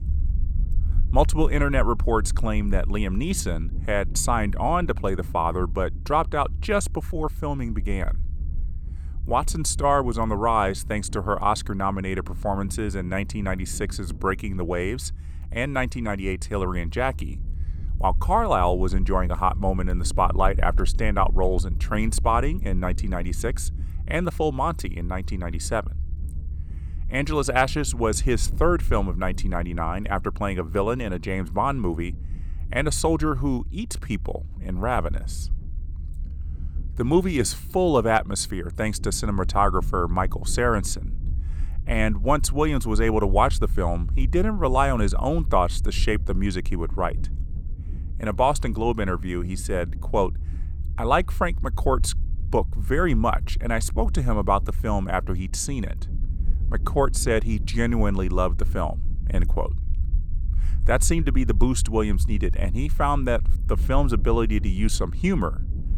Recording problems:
low rumble; faint; throughout; 25 dB below the speech

